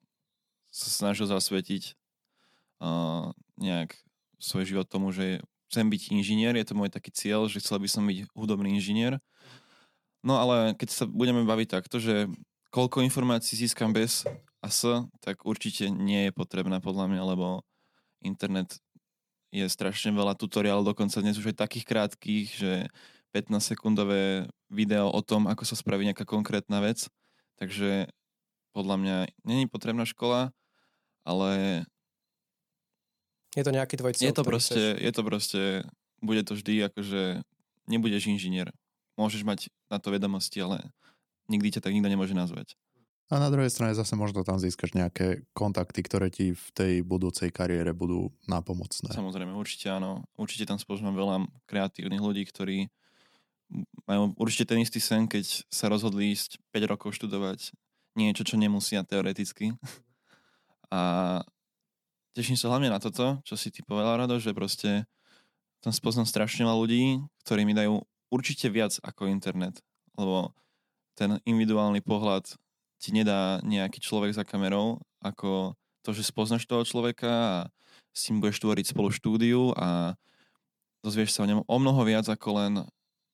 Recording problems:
none

